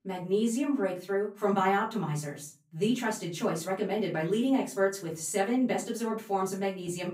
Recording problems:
off-mic speech; far
room echo; slight; dies away in 0.4 s

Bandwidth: 15.5 kHz